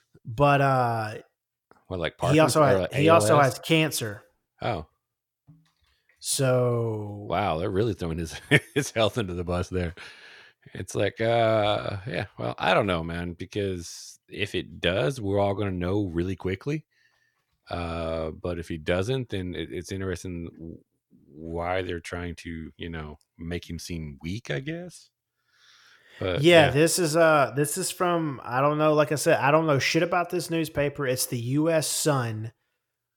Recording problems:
none

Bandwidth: 17.5 kHz